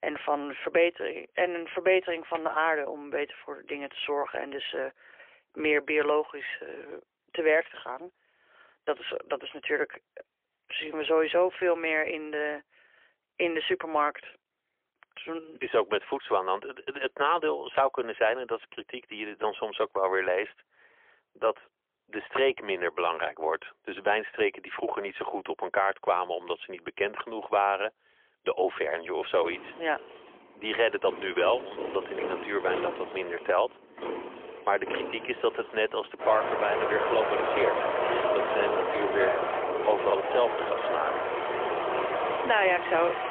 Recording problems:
phone-call audio; poor line; nothing above 3.5 kHz
traffic noise; loud; from 30 s on; 2 dB below the speech

